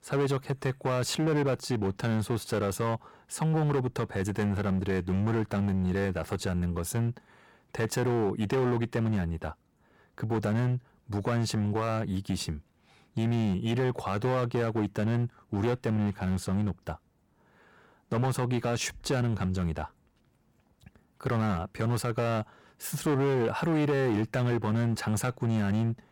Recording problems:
distortion; slight; 13% of the sound clipped

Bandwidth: 17.5 kHz